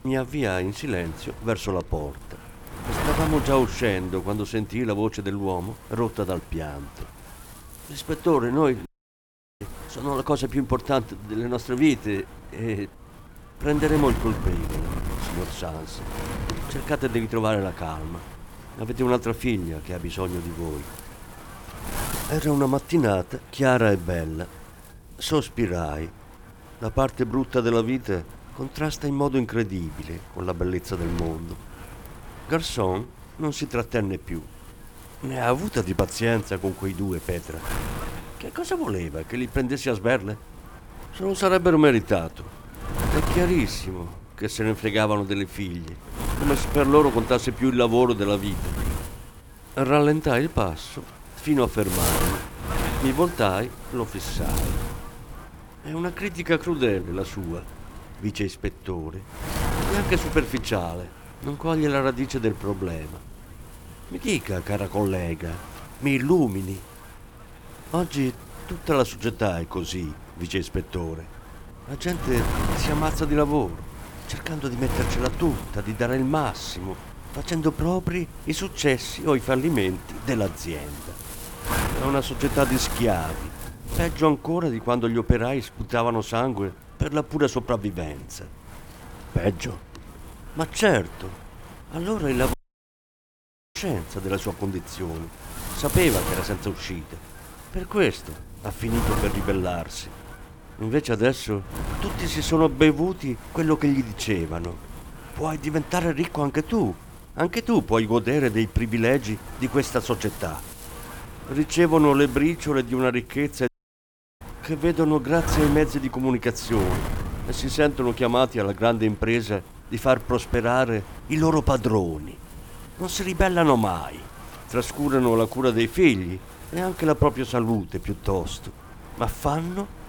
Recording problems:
wind noise on the microphone; occasional gusts; 10 dB below the speech
audio cutting out; at 9 s for 0.5 s, at 1:33 for 1 s and at 1:54 for 0.5 s

